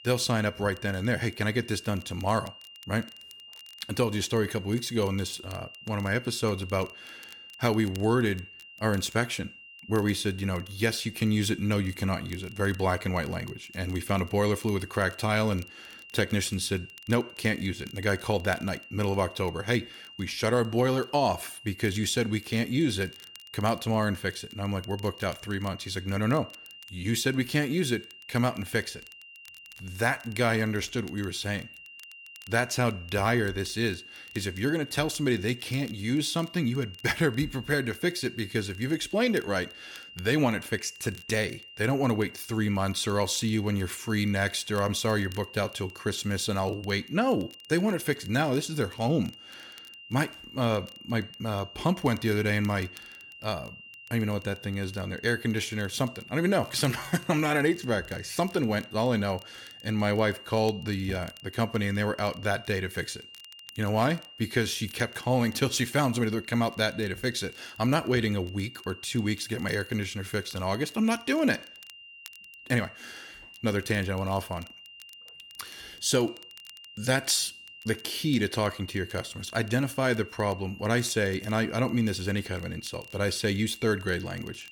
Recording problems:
high-pitched whine; noticeable; throughout; 3 kHz, 15 dB below the speech
crackle, like an old record; faint; 25 dB below the speech

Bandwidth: 17.5 kHz